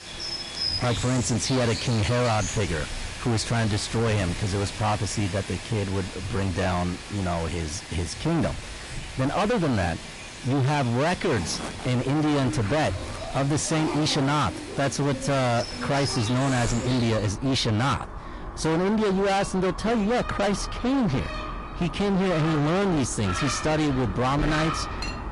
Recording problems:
distortion; heavy; 27% of the sound clipped
garbled, watery; slightly; nothing above 11 kHz
animal sounds; loud; throughout; 9 dB below the speech
household noises; noticeable; throughout; 20 dB below the speech

